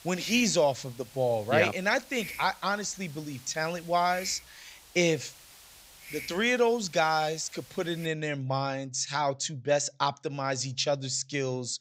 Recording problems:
high frequencies cut off; noticeable; nothing above 8 kHz
hiss; noticeable; until 8 s; 15 dB below the speech

